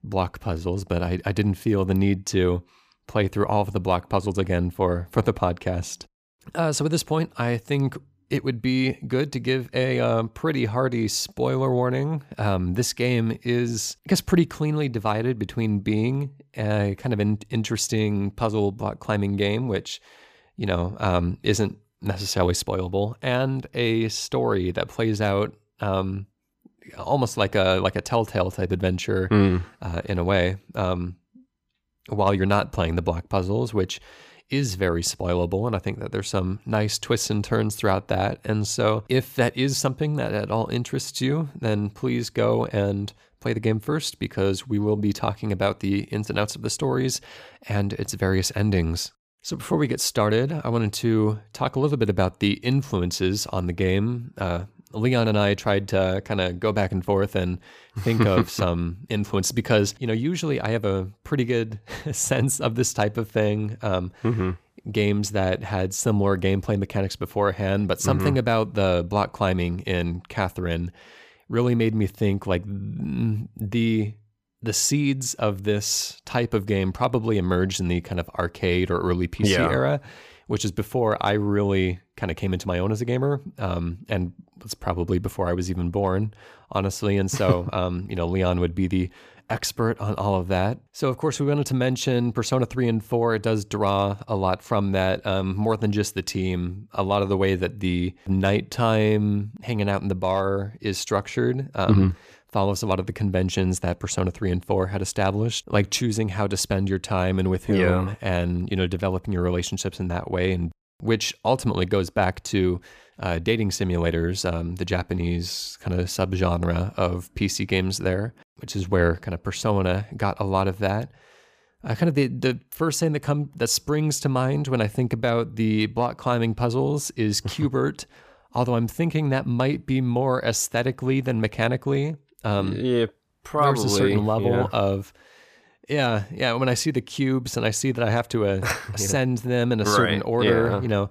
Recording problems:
none

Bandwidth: 15 kHz